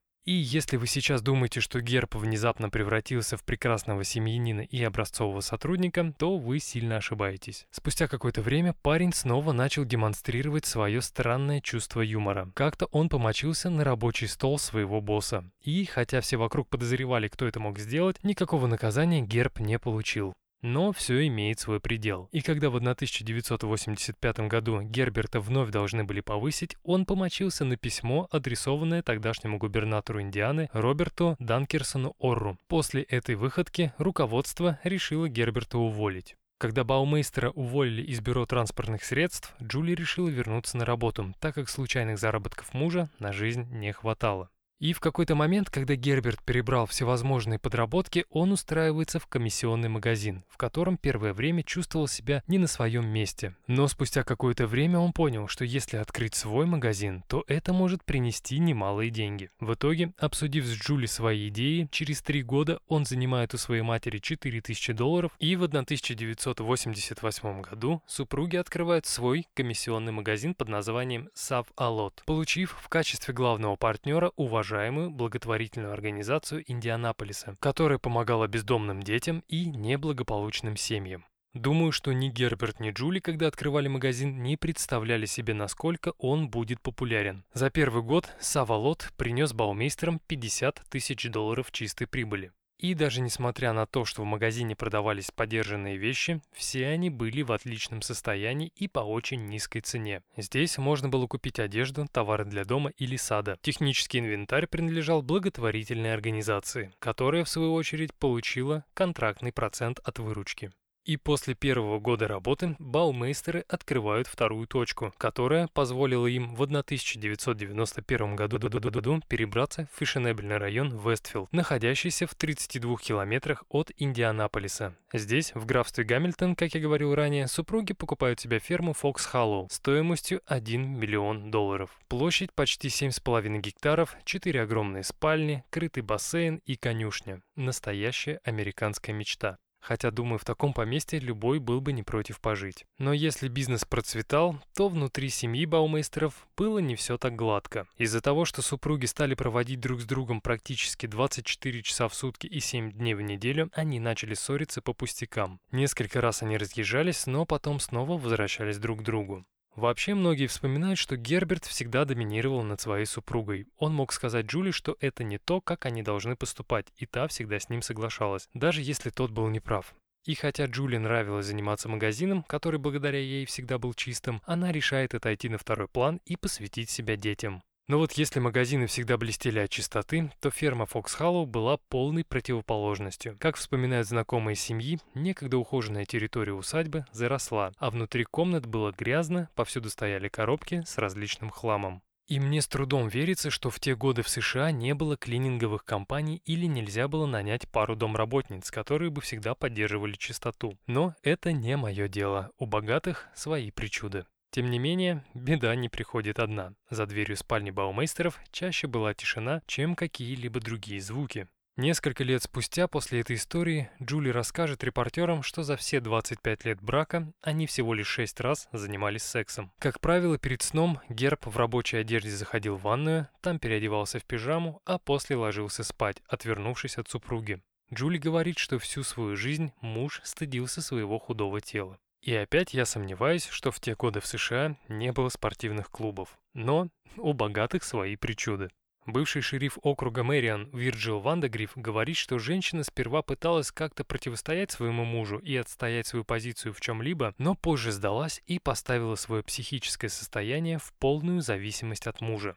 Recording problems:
audio stuttering; at 1:58

